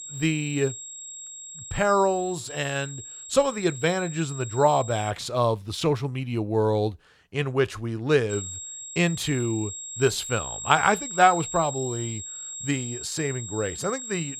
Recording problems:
high-pitched whine; loud; until 5 s and from 8.5 s on; 7.5 kHz, 9 dB below the speech

